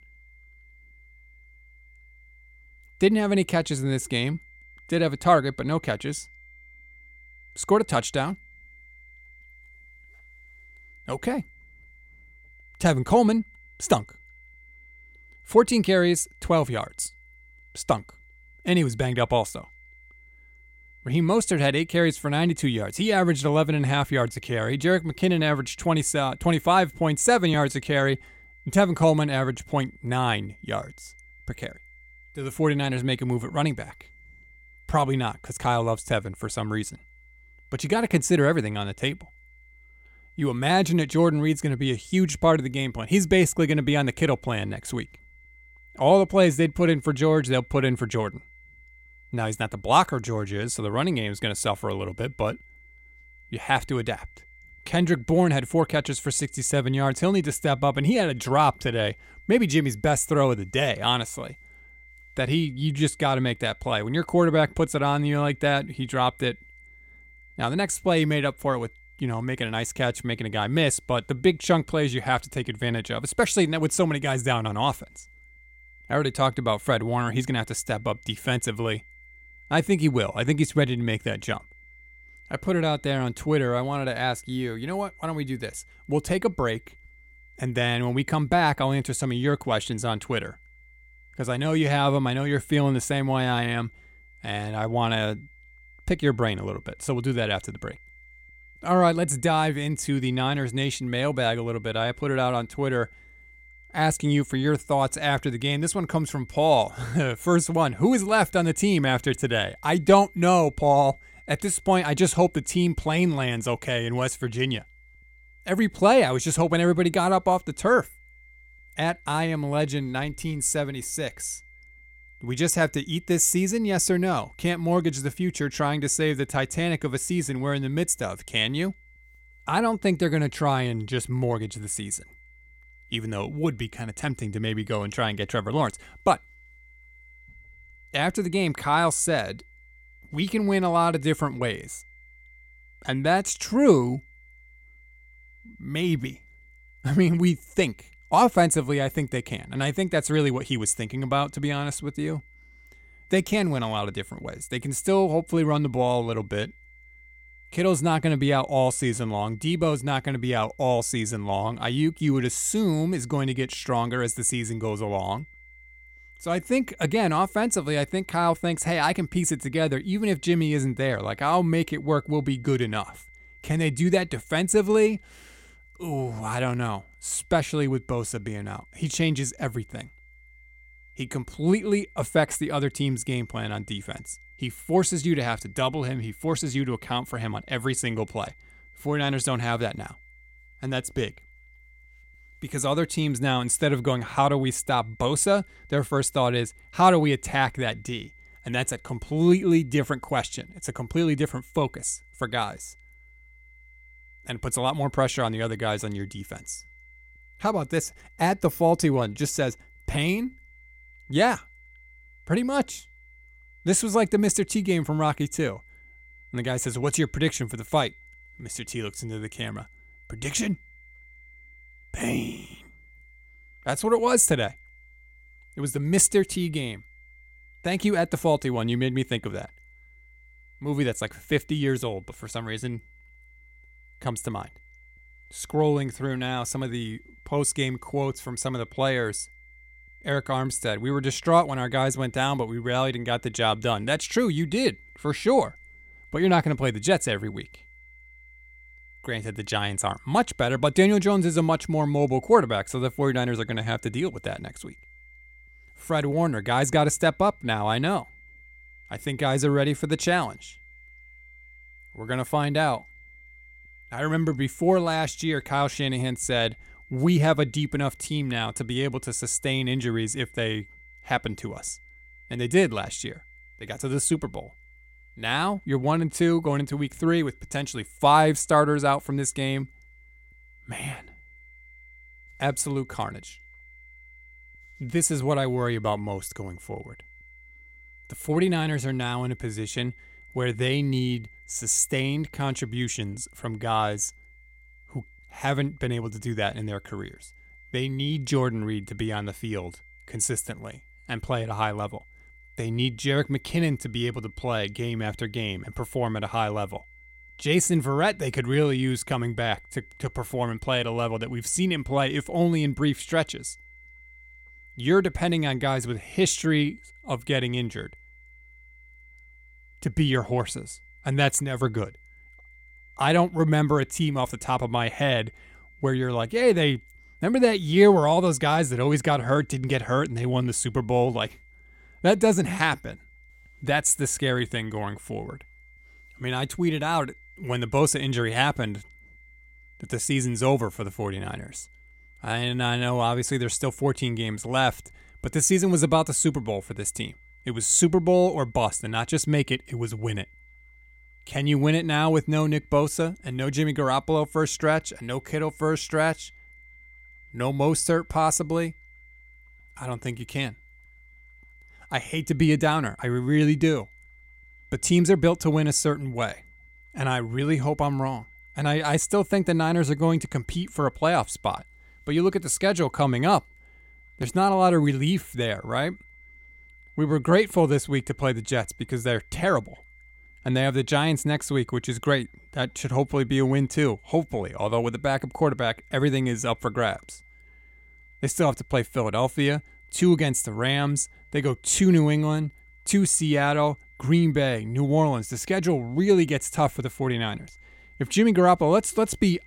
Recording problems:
high-pitched whine; faint; throughout; 2 kHz, 25 dB below the speech

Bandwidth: 16.5 kHz